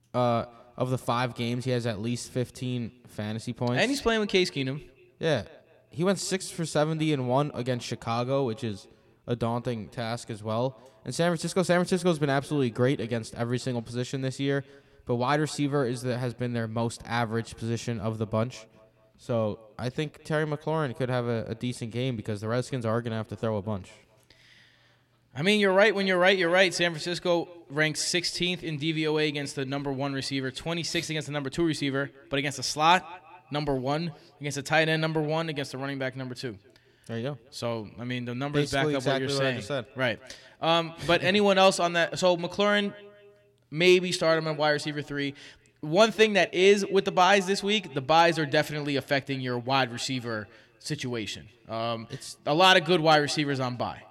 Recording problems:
echo of what is said; faint; throughout; 210 ms later, 25 dB below the speech

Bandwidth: 16.5 kHz